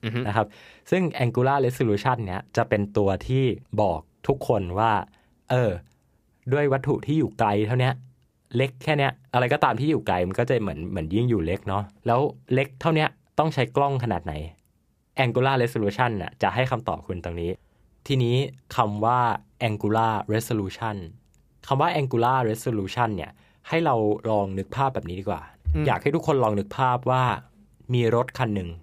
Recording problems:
none

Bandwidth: 15 kHz